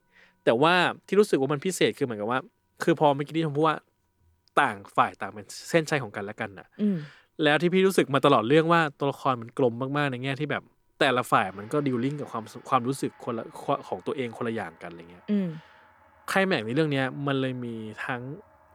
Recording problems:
background music; faint; throughout; 30 dB below the speech

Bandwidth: 18.5 kHz